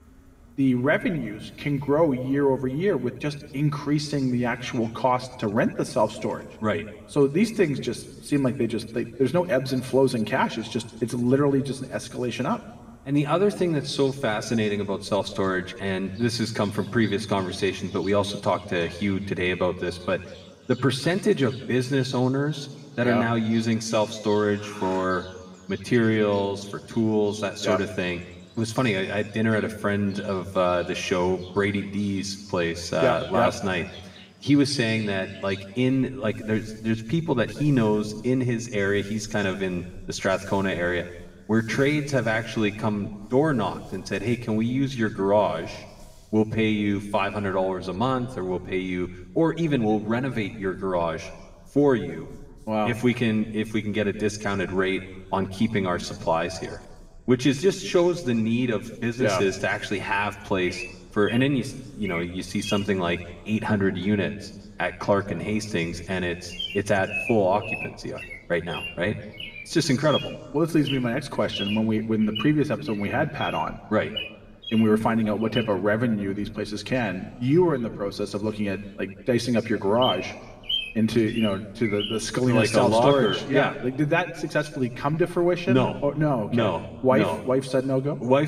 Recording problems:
room echo; slight; dies away in 1.2 s
off-mic speech; somewhat distant
animal sounds; noticeable; throughout; 15 dB below the speech
abrupt cut into speech; at the end

